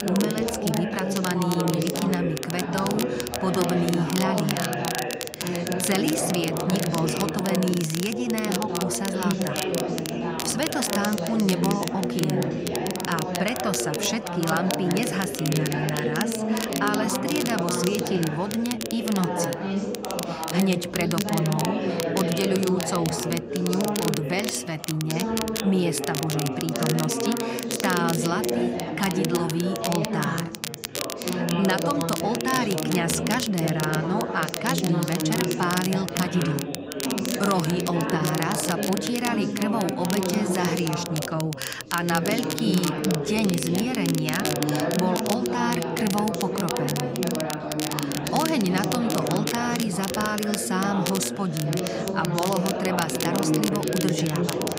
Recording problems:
chatter from many people; loud; throughout; 1 dB below the speech
crackle, like an old record; loud; 6 dB below the speech

